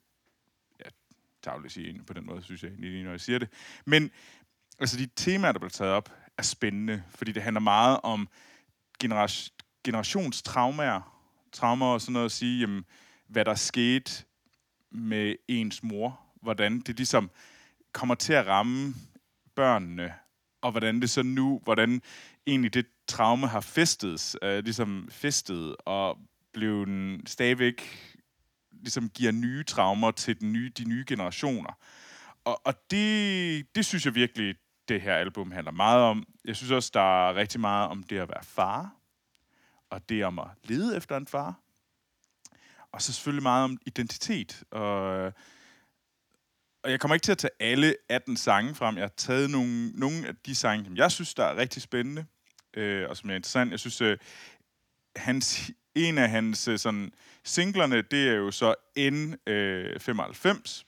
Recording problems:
none

